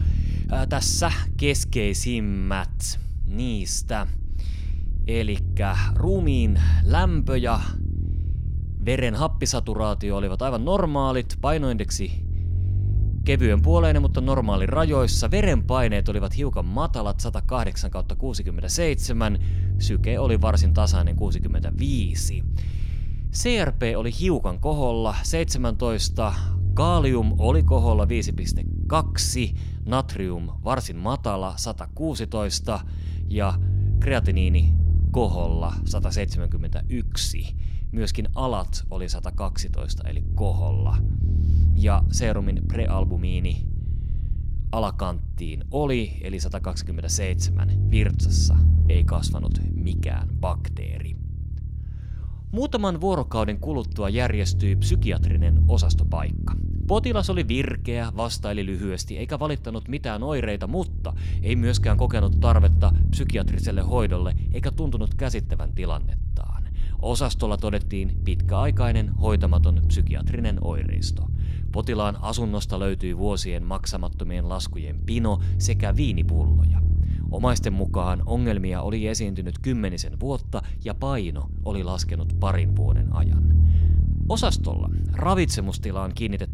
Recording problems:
low rumble; noticeable; throughout; 15 dB below the speech

